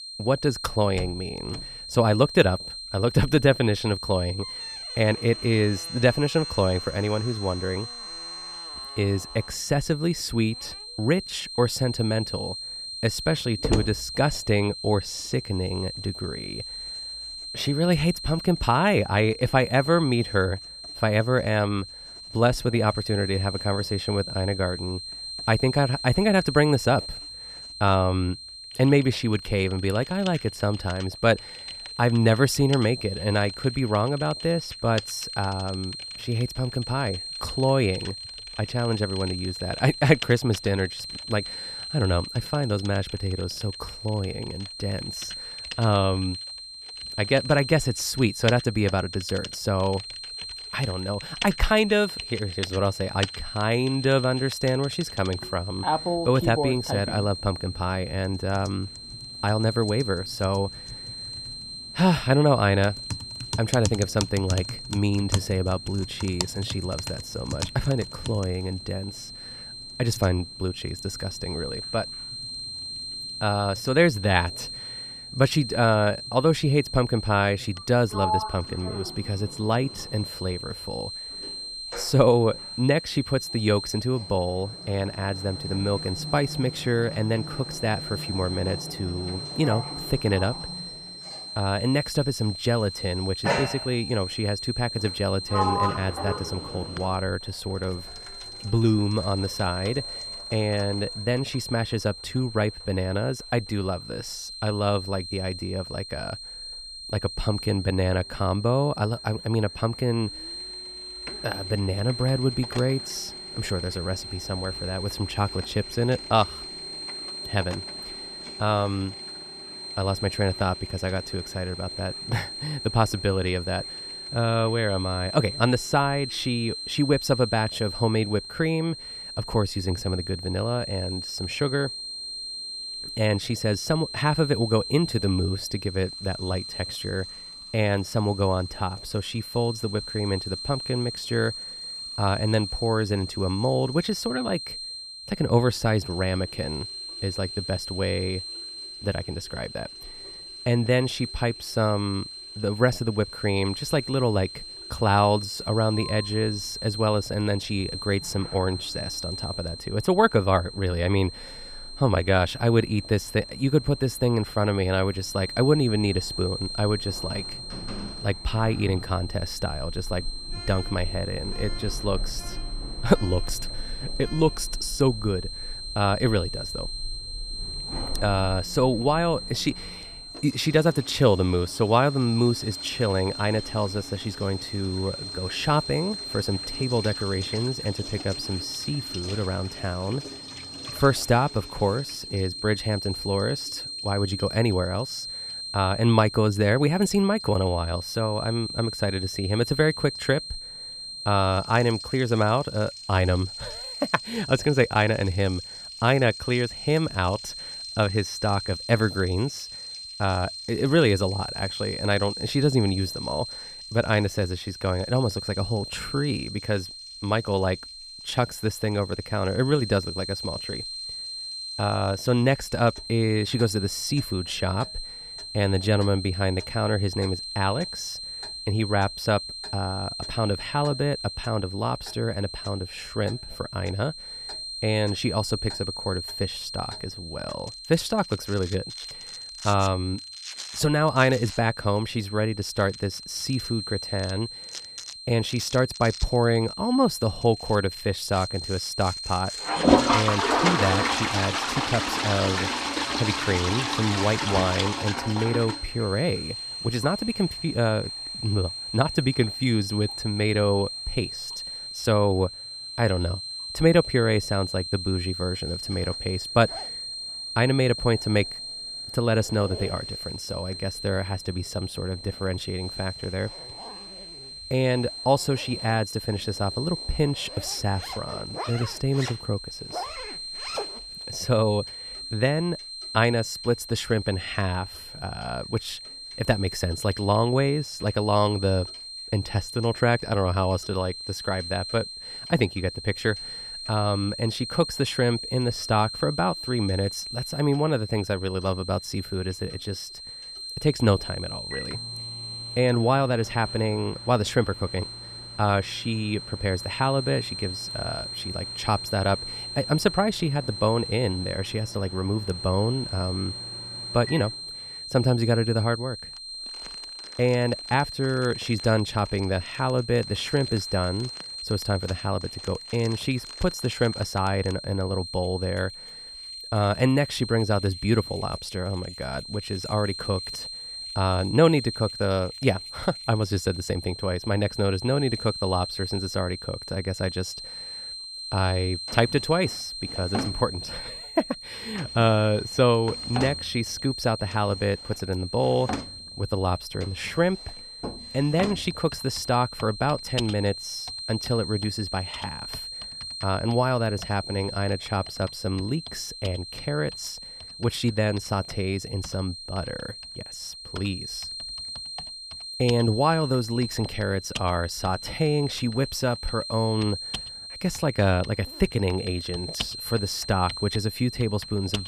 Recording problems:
high-pitched whine; loud; throughout; 4 kHz, 9 dB below the speech
household noises; noticeable; throughout; 10 dB below the speech

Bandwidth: 15 kHz